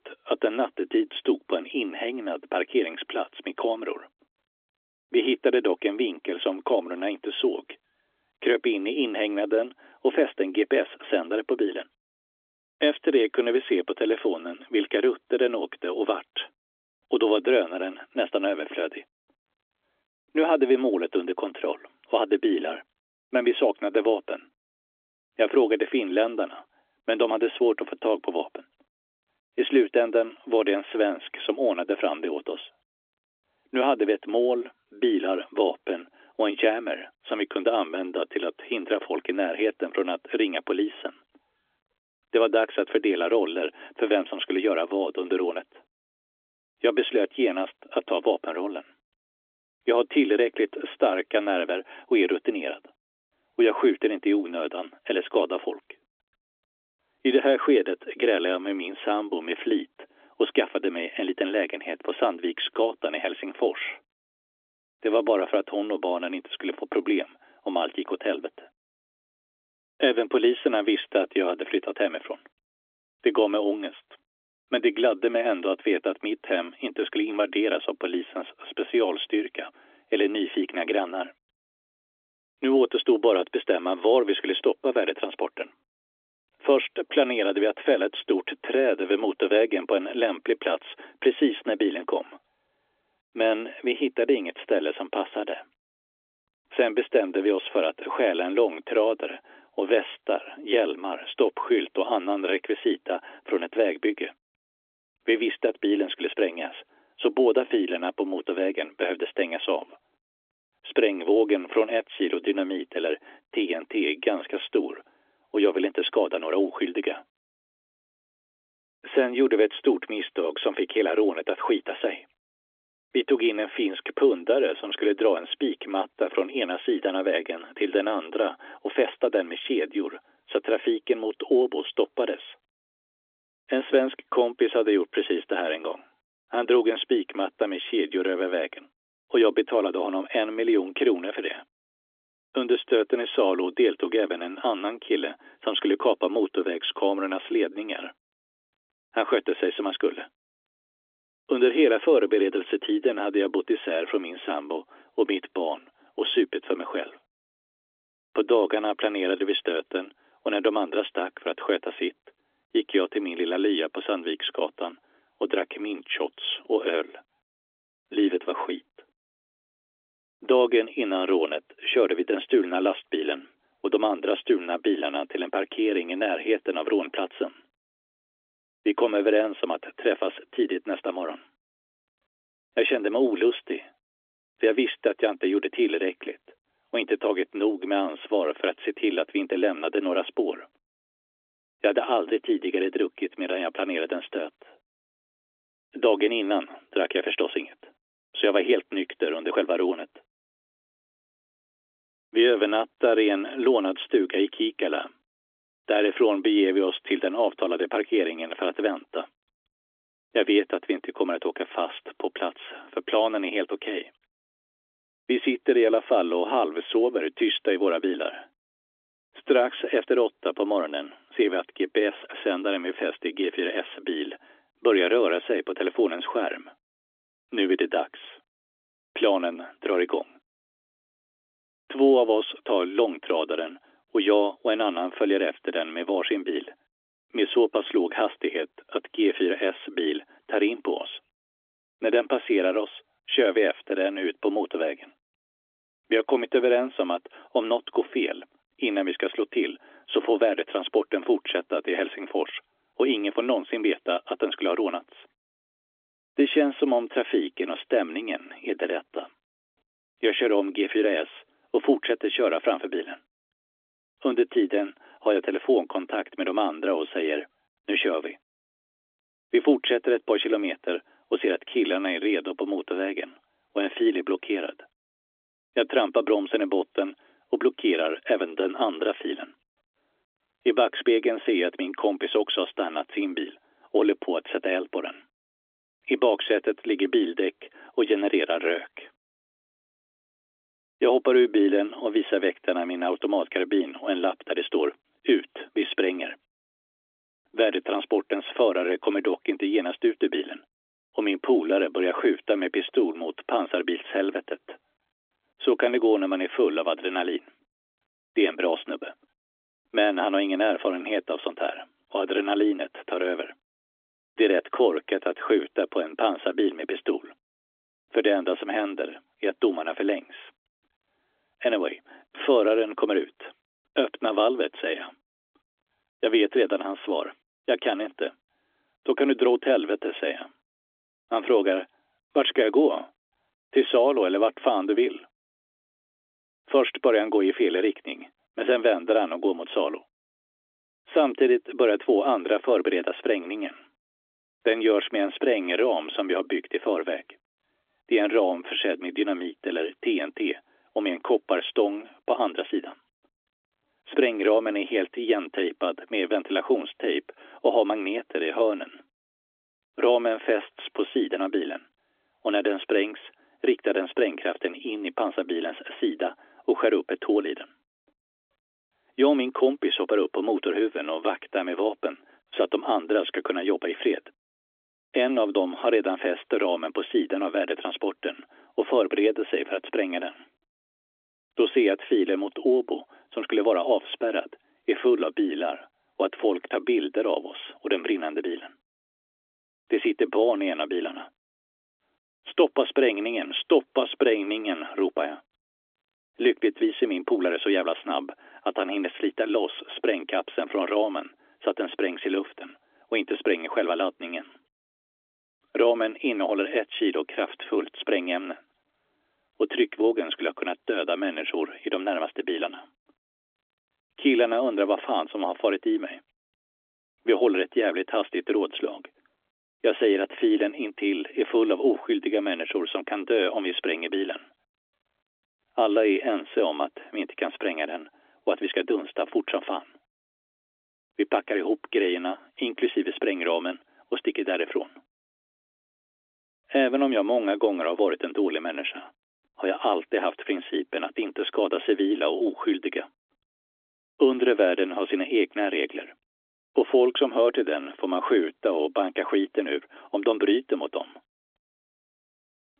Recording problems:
phone-call audio; nothing above 3.5 kHz

